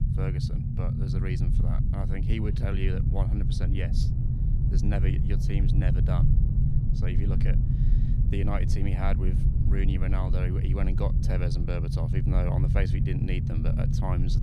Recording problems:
low rumble; loud; throughout; 2 dB below the speech

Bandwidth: 15 kHz